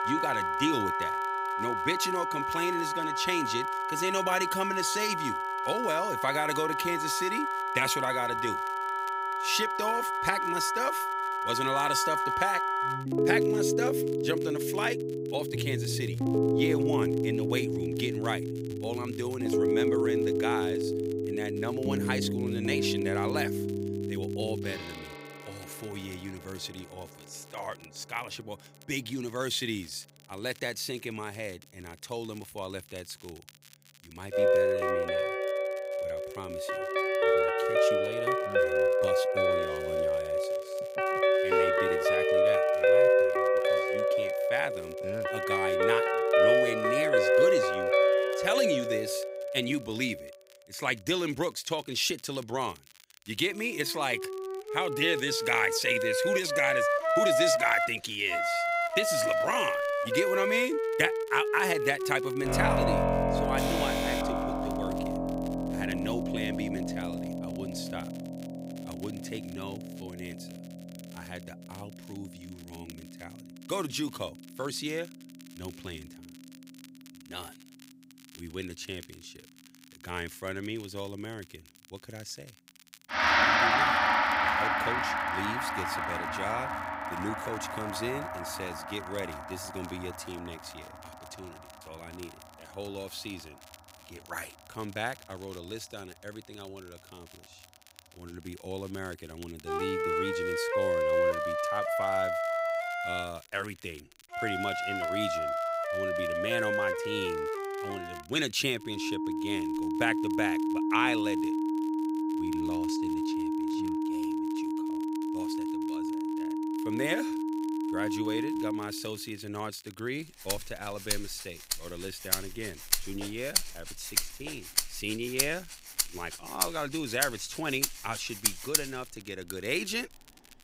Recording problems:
background music; very loud; throughout; 5 dB above the speech
crackle, like an old record; faint; 20 dB below the speech
alarm; loud; from 1:04 to 1:05; peak level with the speech

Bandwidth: 15.5 kHz